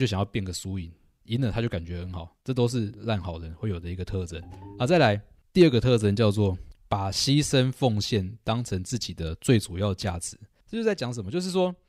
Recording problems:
abrupt cut into speech; at the start
phone ringing; faint; at 4.5 s; peak 20 dB below the speech

